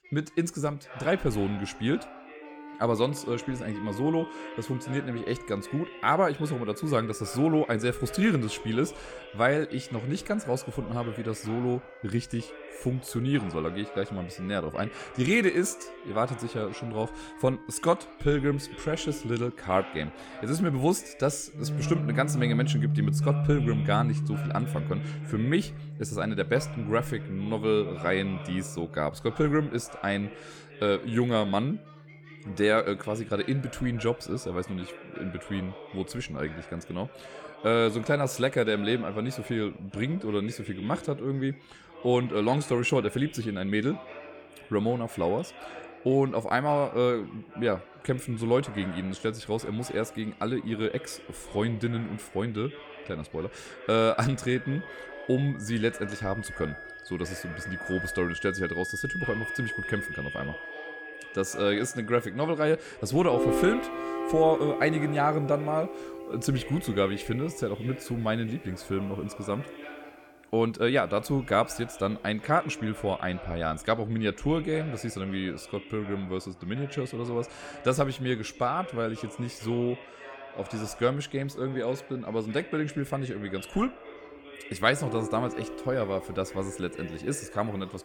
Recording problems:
background music; loud; throughout; 7 dB below the speech
background chatter; noticeable; throughout; 3 voices, 15 dB below the speech

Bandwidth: 18 kHz